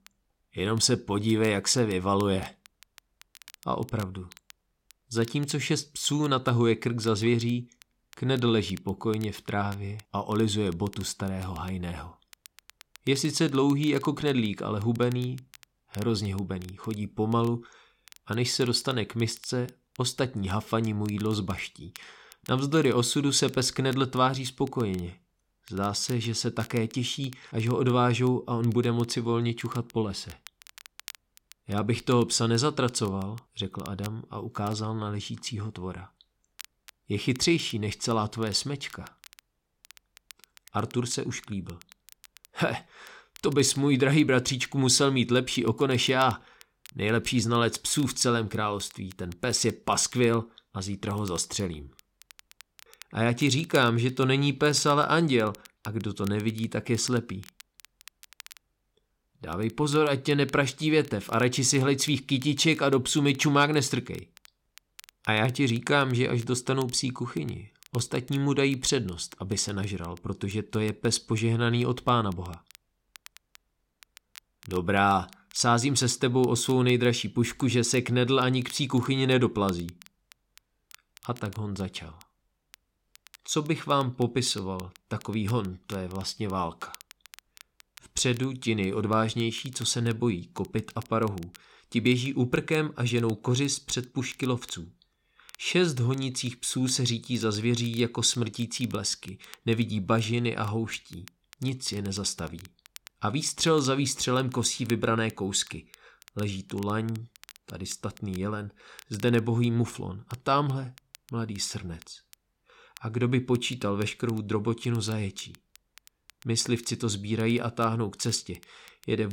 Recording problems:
crackle, like an old record; faint; 25 dB below the speech
abrupt cut into speech; at the end

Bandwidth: 16.5 kHz